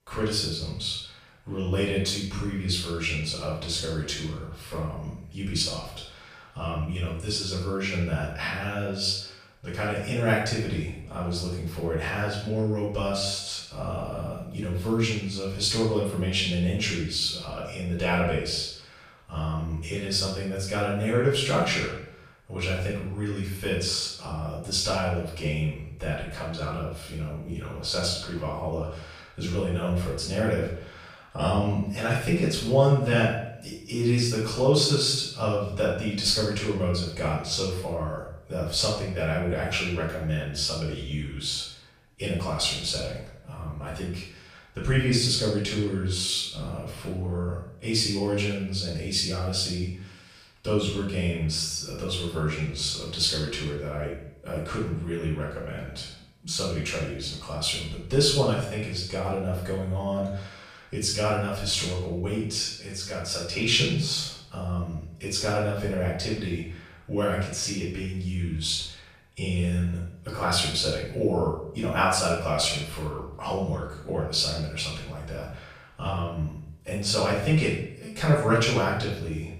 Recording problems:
off-mic speech; far
room echo; noticeable; dies away in 0.6 s

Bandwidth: 14.5 kHz